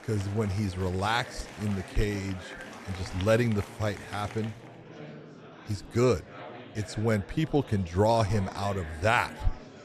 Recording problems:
murmuring crowd; noticeable; throughout; 15 dB below the speech

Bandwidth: 13.5 kHz